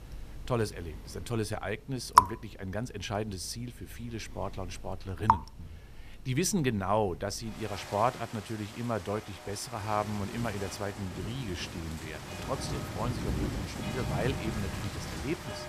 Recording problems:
rain or running water; very loud; throughout; 1 dB above the speech

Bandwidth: 14.5 kHz